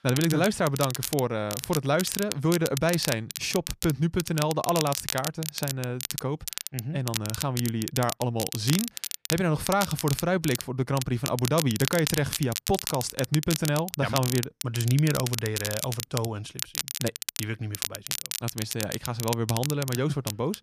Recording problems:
crackle, like an old record; loud; 5 dB below the speech

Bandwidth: 14.5 kHz